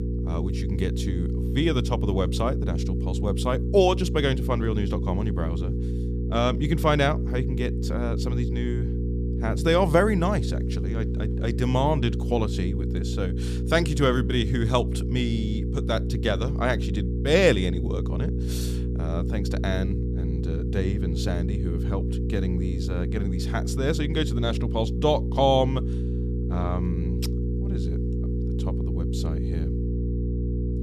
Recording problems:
electrical hum; loud; throughout; 60 Hz, 10 dB below the speech

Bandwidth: 14.5 kHz